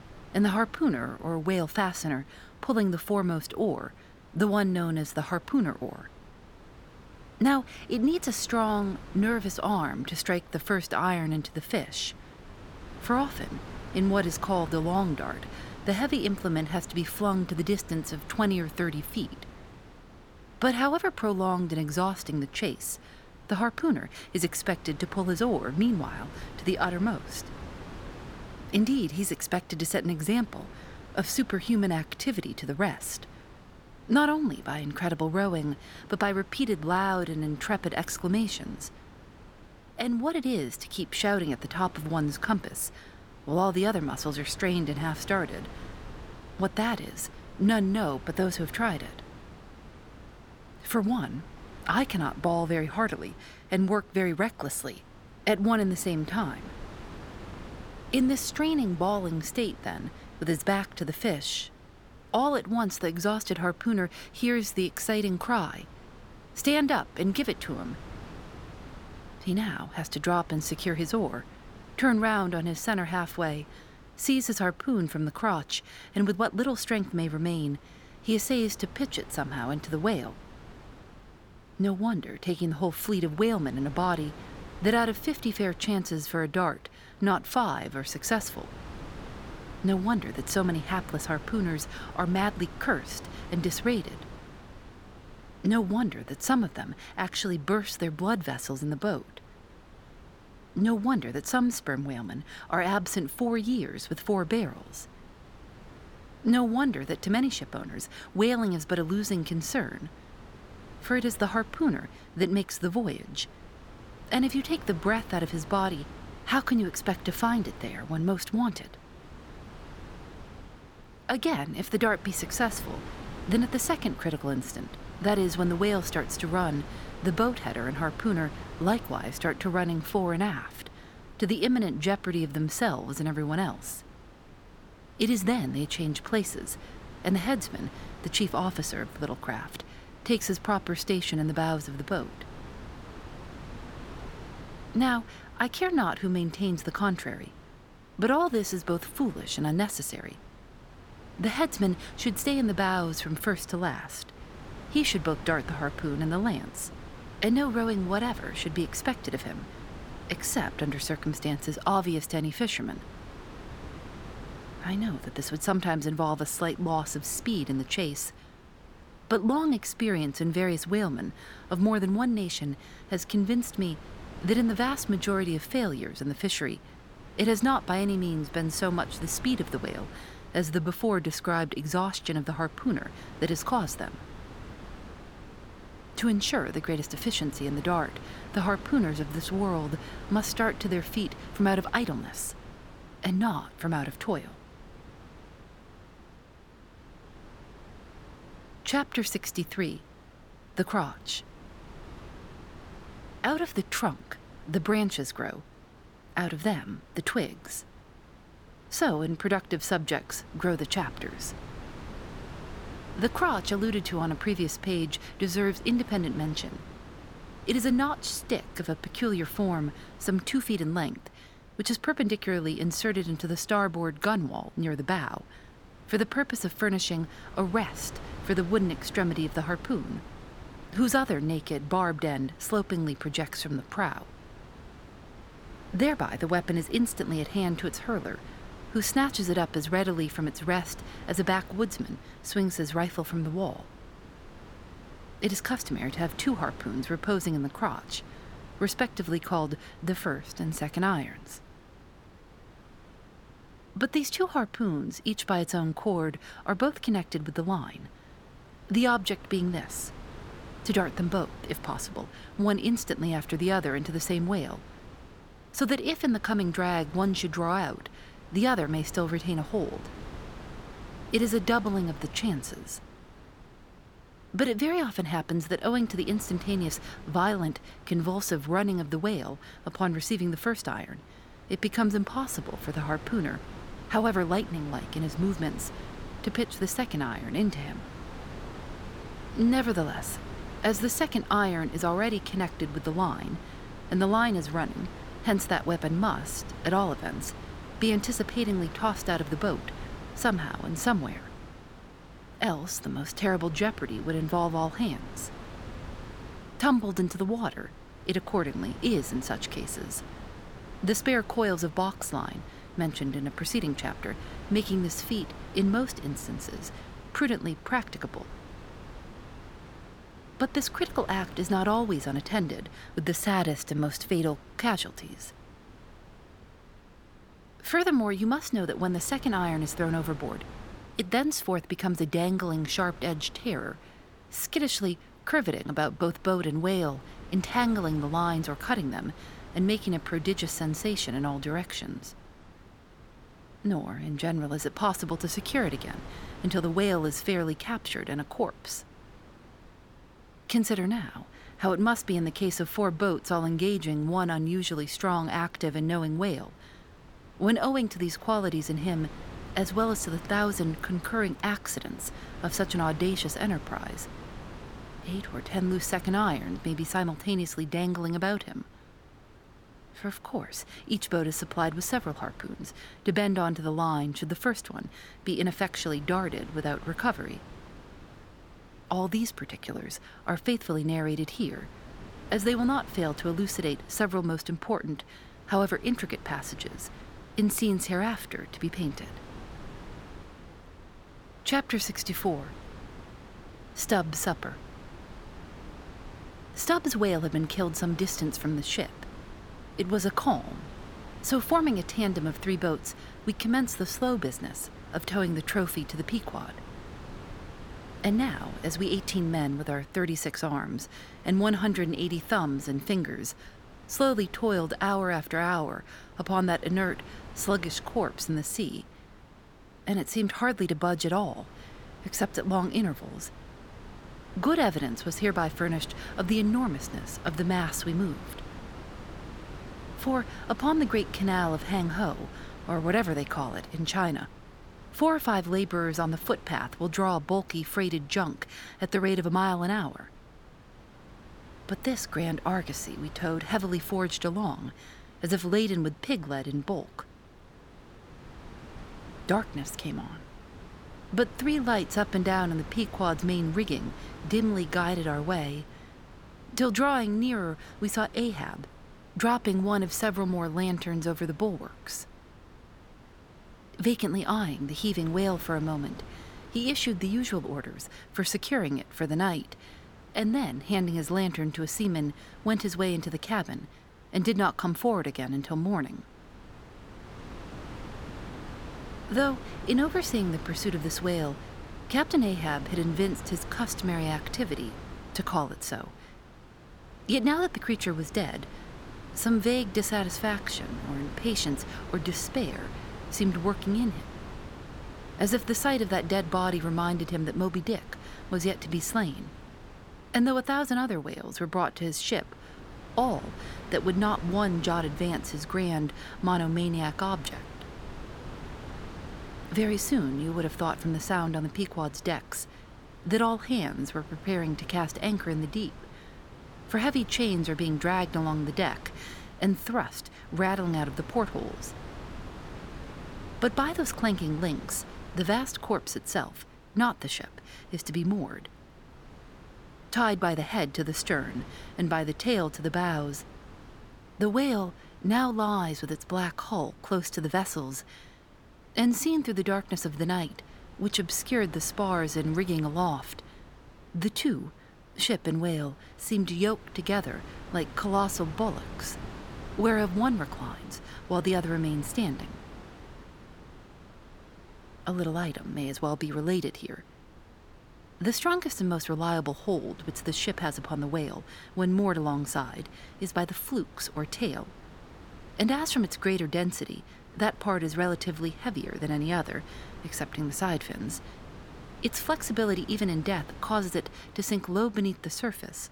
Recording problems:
wind noise on the microphone; occasional gusts; 20 dB below the speech

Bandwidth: 18 kHz